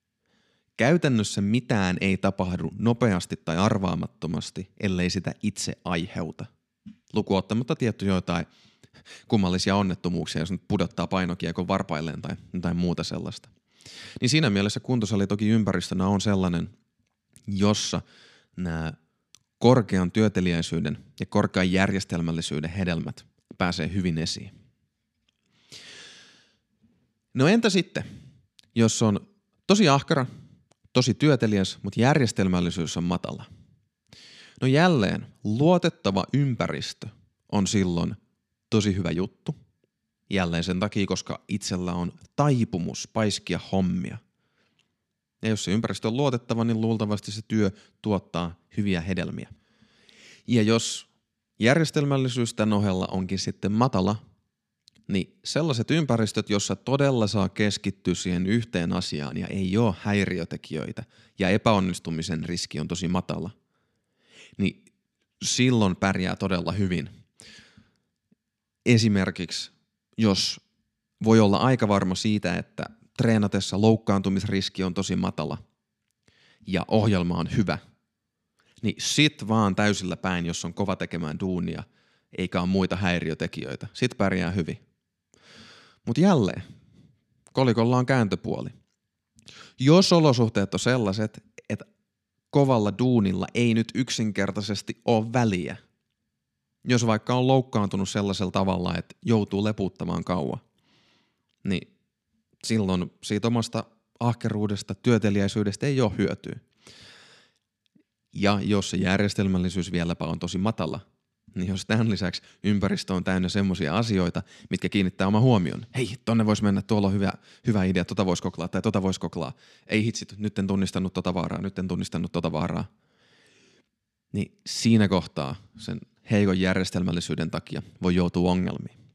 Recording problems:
none

